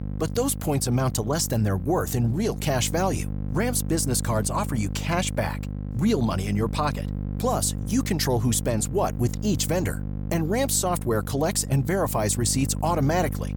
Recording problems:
electrical hum; noticeable; throughout; 50 Hz, 15 dB below the speech

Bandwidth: 18.5 kHz